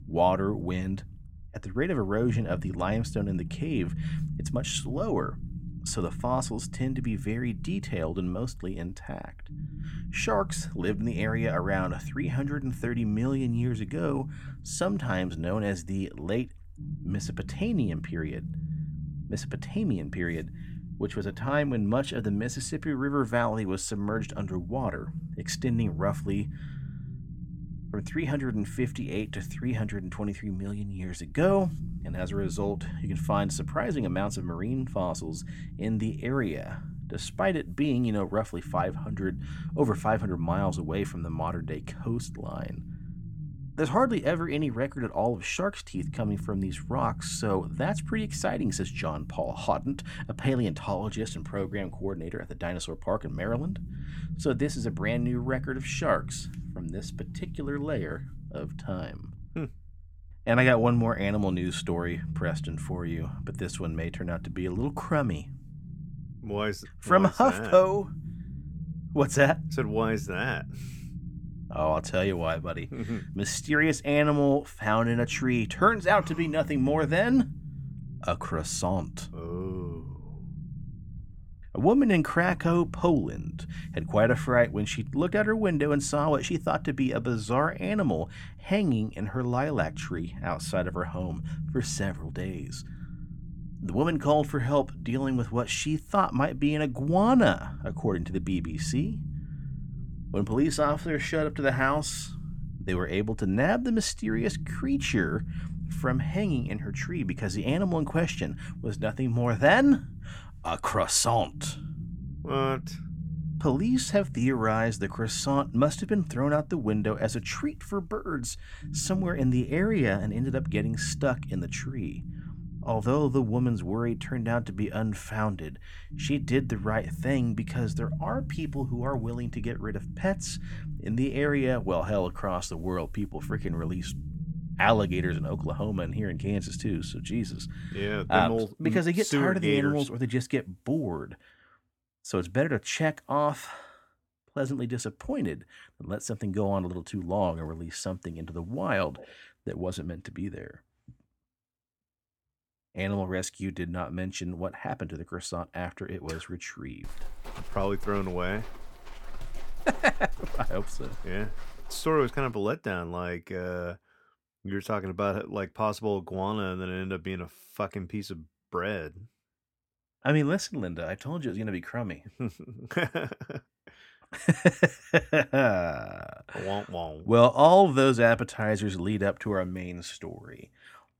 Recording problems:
low rumble; noticeable; until 2:19; 20 dB below the speech
footsteps; faint; from 2:37 to 2:42; peak 15 dB below the speech

